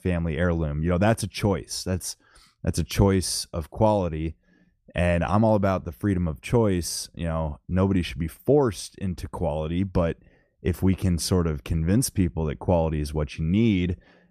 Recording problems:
none

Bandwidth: 14.5 kHz